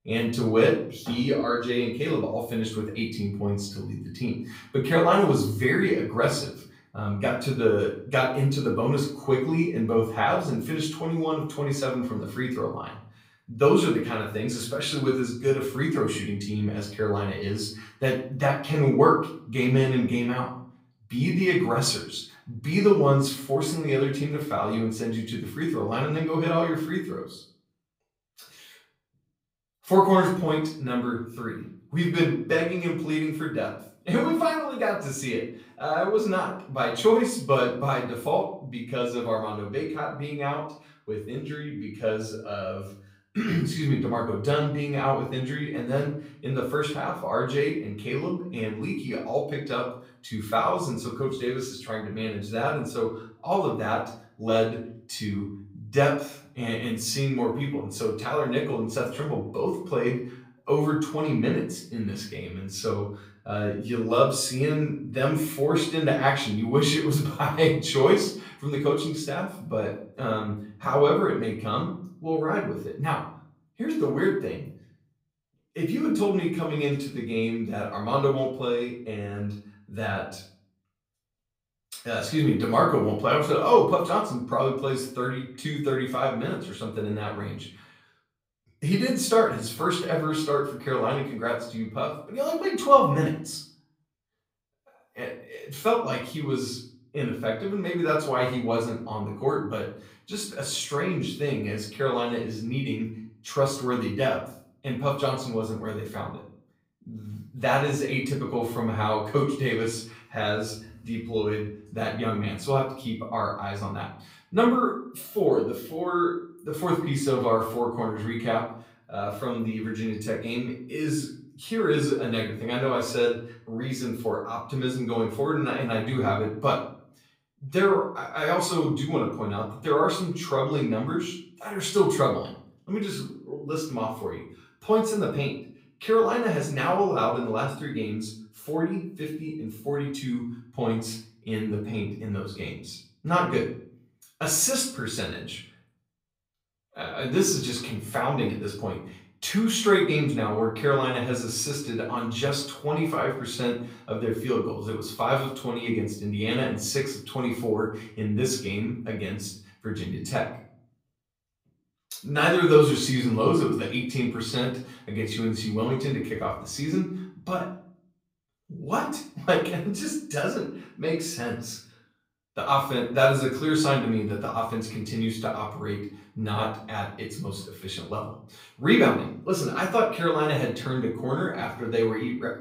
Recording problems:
off-mic speech; far
room echo; slight; dies away in 0.5 s

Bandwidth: 15.5 kHz